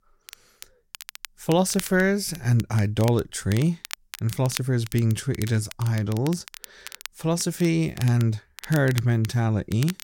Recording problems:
crackle, like an old record; noticeable; 15 dB below the speech

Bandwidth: 16.5 kHz